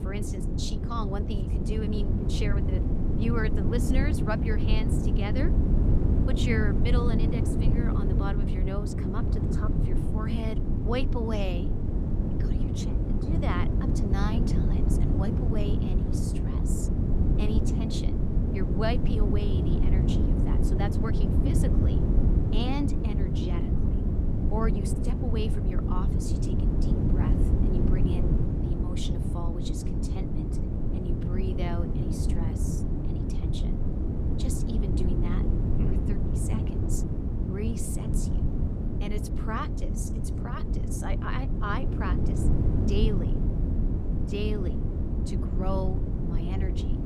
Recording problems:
wind noise on the microphone; heavy; as loud as the speech

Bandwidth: 15.5 kHz